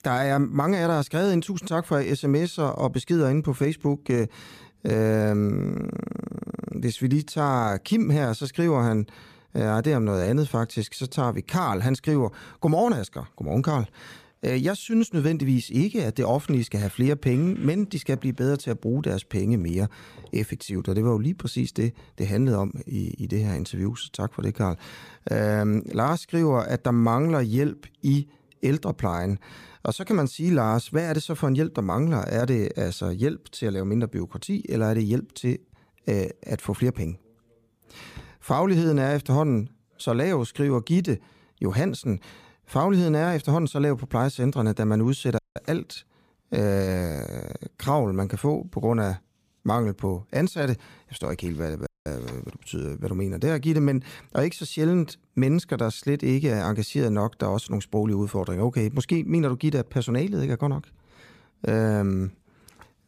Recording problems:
audio cutting out; at 45 s and at 52 s

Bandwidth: 15 kHz